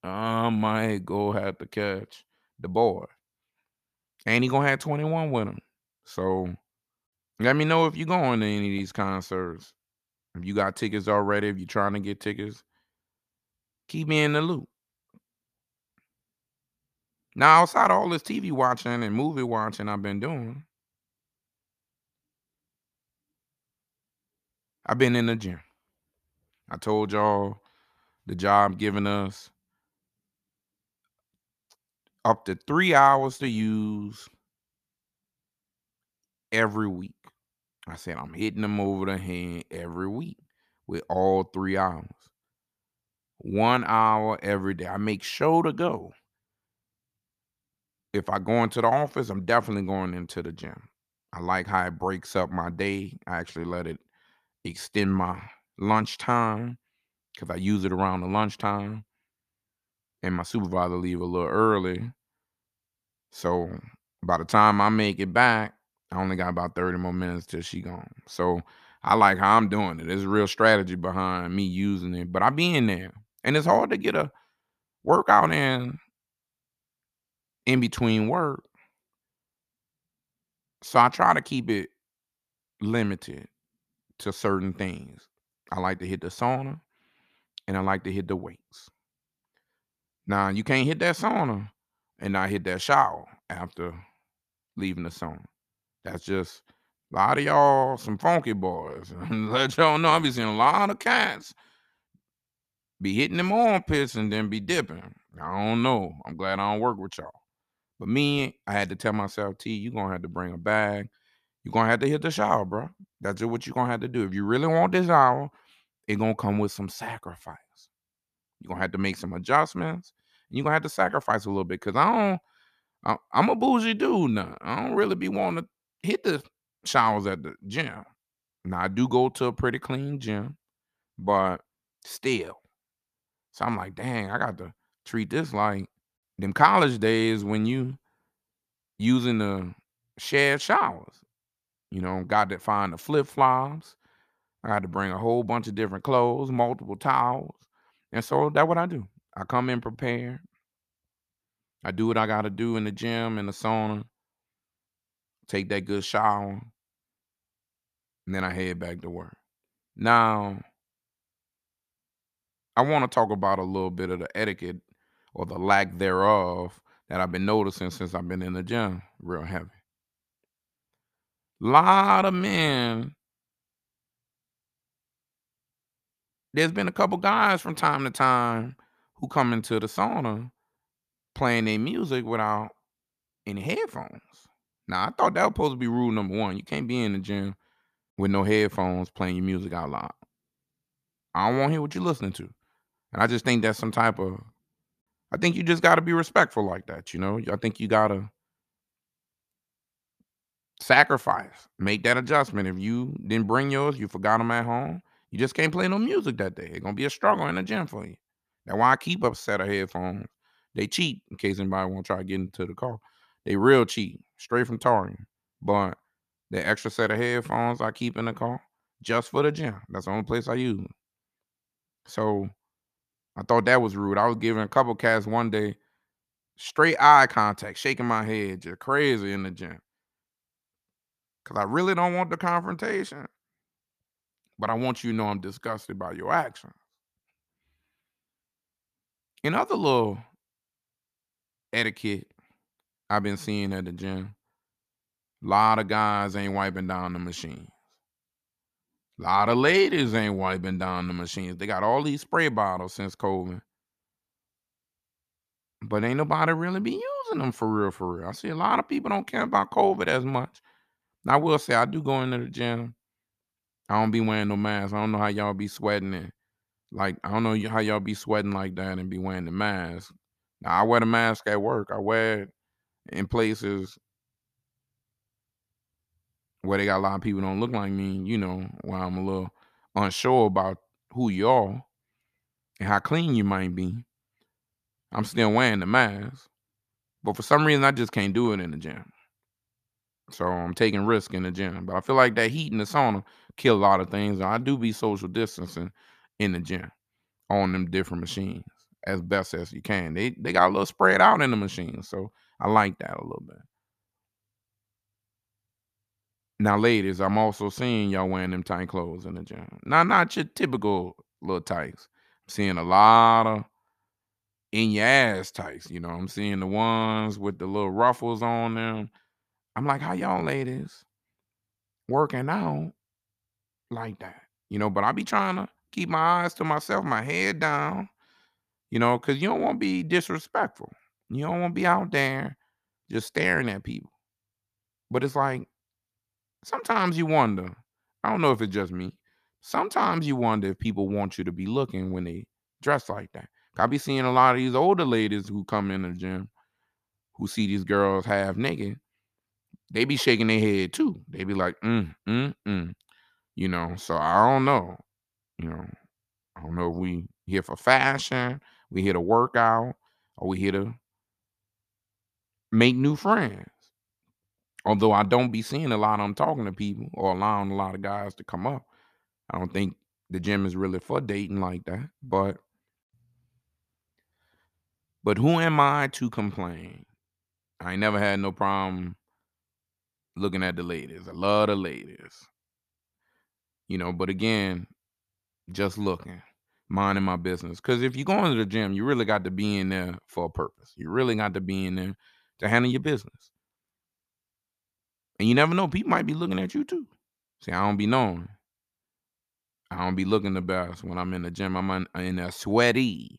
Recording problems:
none

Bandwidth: 14.5 kHz